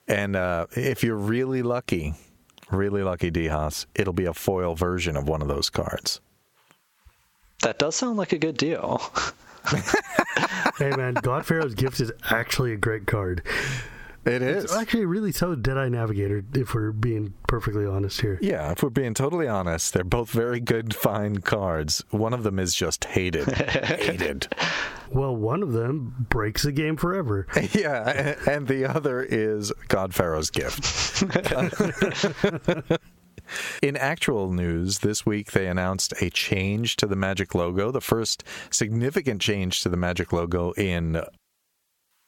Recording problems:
squashed, flat; heavily

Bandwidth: 17 kHz